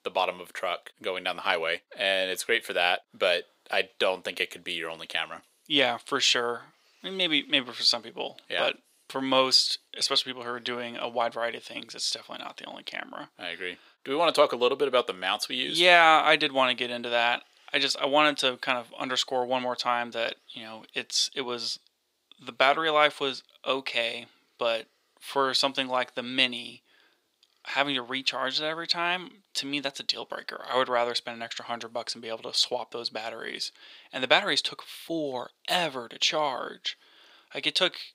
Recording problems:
thin; somewhat; fading below 500 Hz

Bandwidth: 15.5 kHz